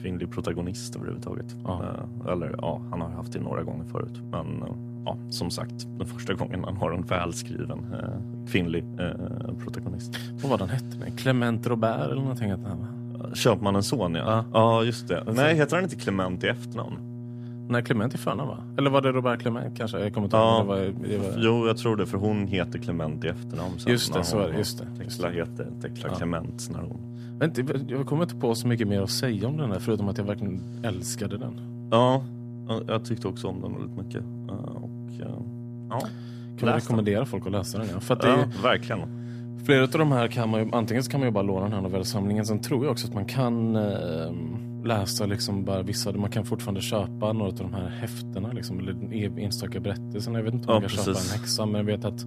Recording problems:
electrical hum; noticeable; throughout; 60 Hz, 15 dB below the speech

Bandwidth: 14.5 kHz